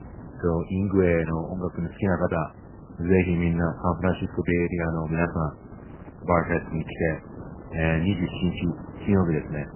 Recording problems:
garbled, watery; badly; nothing above 3 kHz
wind noise on the microphone; occasional gusts; 20 dB below the speech

